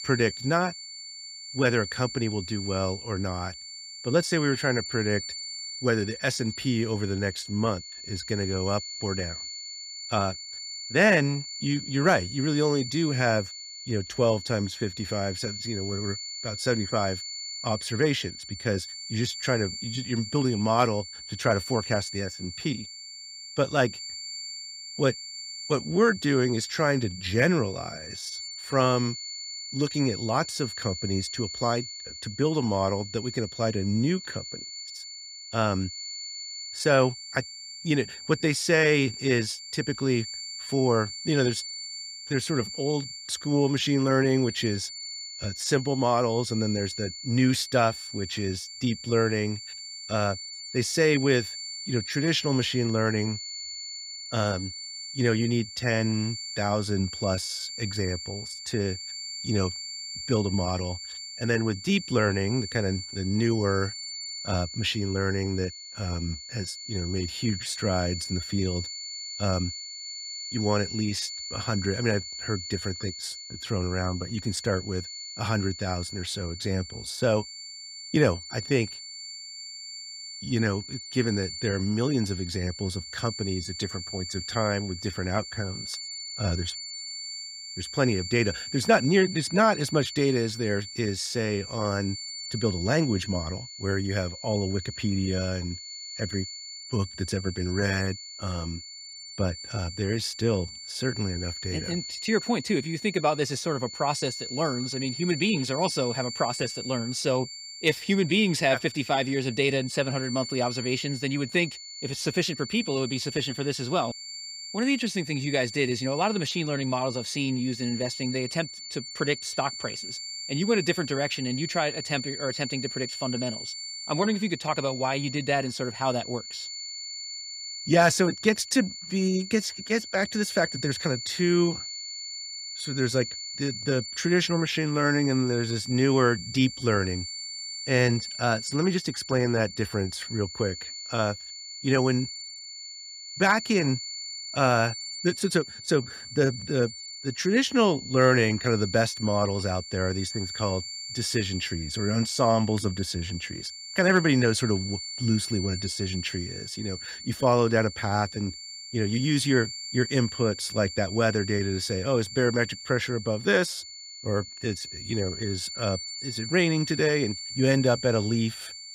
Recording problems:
high-pitched whine; loud; throughout; 4.5 kHz, 9 dB below the speech

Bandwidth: 15.5 kHz